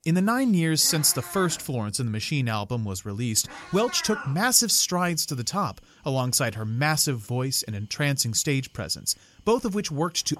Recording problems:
animal sounds; noticeable; throughout; 15 dB below the speech

